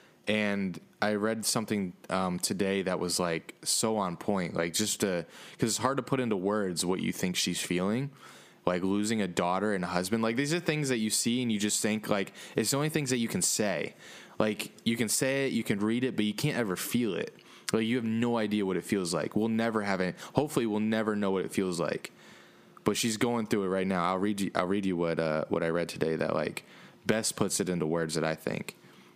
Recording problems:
squashed, flat; somewhat

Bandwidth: 15 kHz